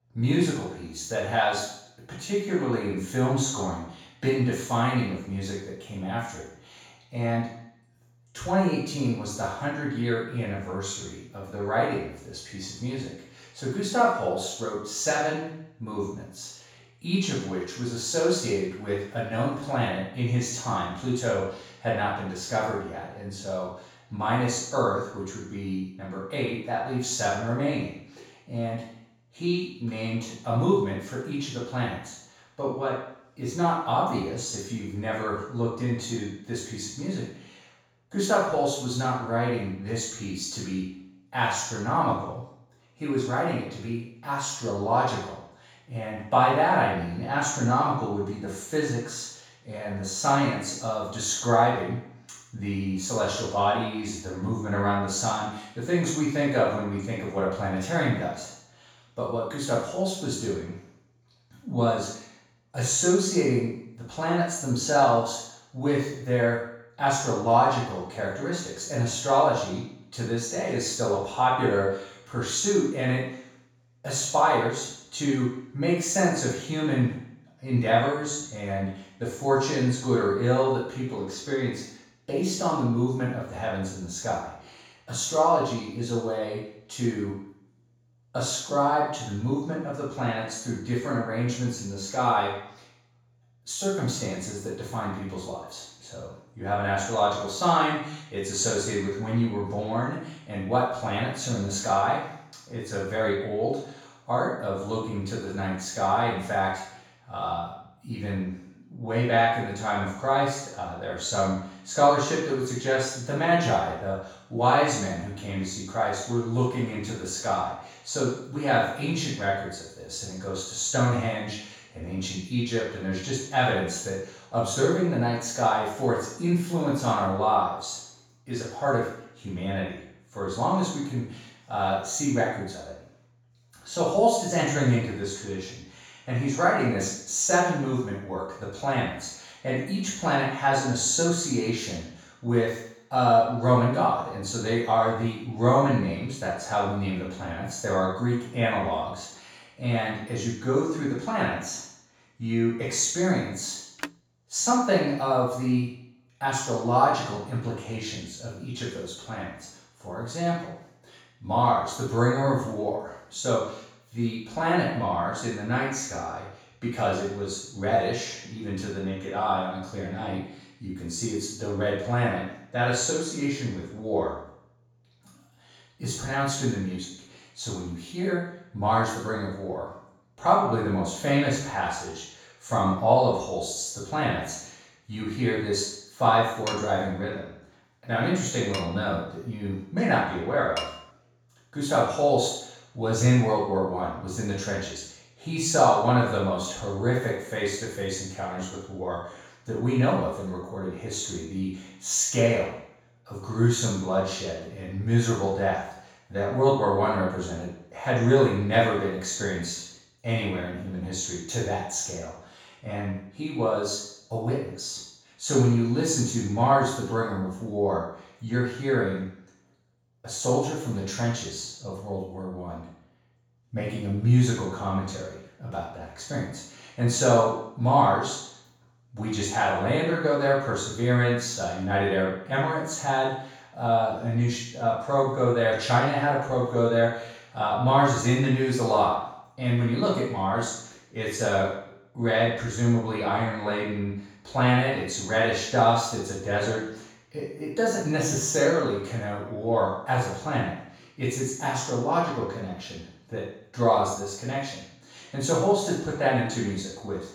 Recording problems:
room echo; strong; dies away in 0.7 s
off-mic speech; far
phone ringing; faint; at 2:34; peak 10 dB below the speech
clattering dishes; noticeable; from 3:07 to 3:11; peak 8 dB below the speech

